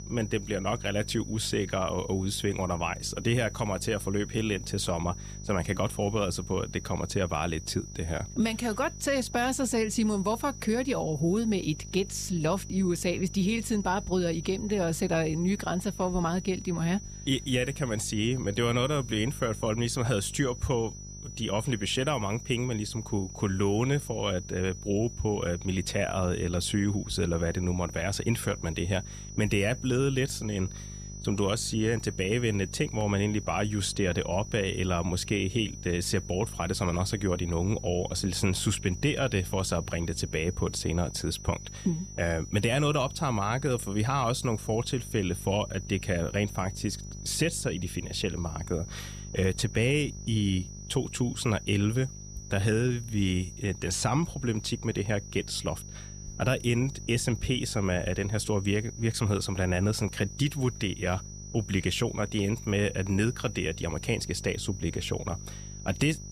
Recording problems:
high-pitched whine; noticeable; throughout; 6 kHz, 15 dB below the speech
electrical hum; faint; throughout; 50 Hz, 25 dB below the speech

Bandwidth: 14.5 kHz